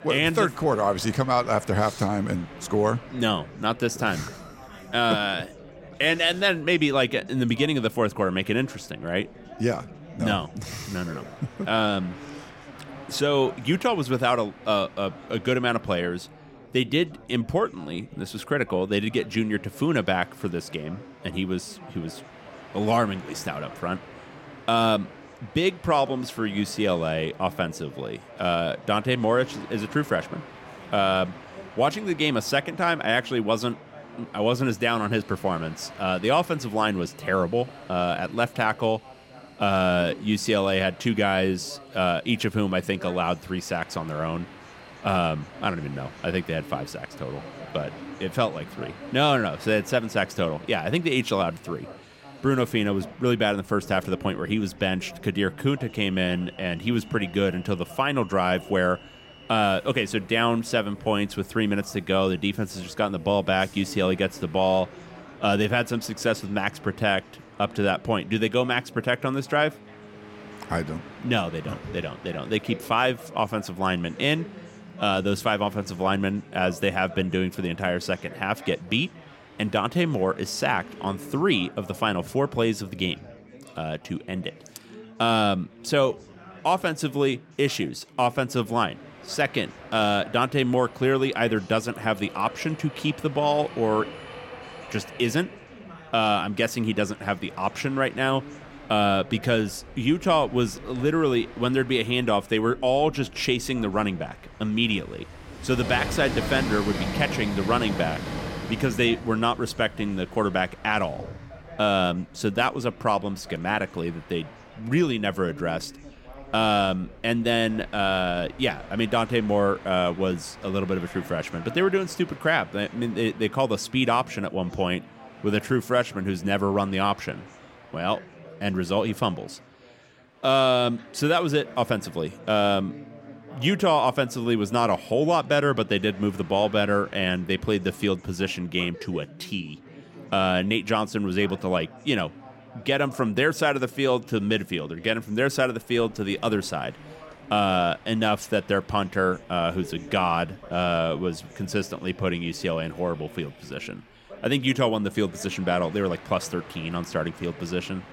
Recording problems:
train or aircraft noise; noticeable; throughout; 20 dB below the speech
background chatter; faint; throughout; 4 voices, 20 dB below the speech

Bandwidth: 16.5 kHz